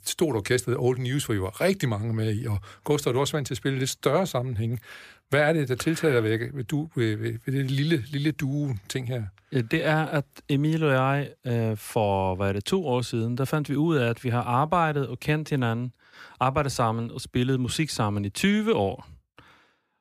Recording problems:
none

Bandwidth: 15 kHz